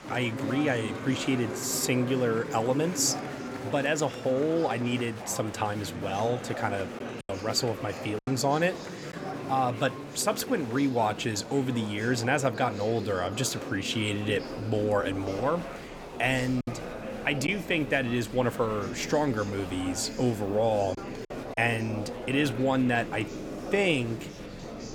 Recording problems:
murmuring crowd; loud; throughout; 9 dB below the speech
choppy; very; from 7 to 9 s, at 17 s and at 21 s; 5% of the speech affected

